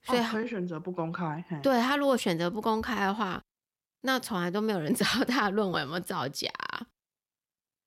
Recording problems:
none

